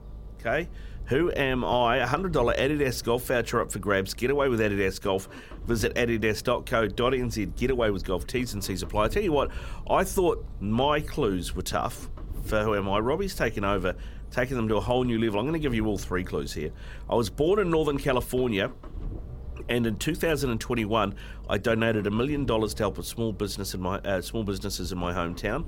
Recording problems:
low rumble; faint; throughout; 25 dB below the speech

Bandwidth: 16.5 kHz